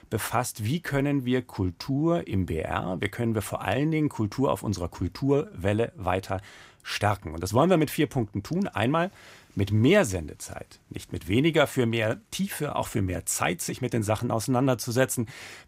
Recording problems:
none

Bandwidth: 15.5 kHz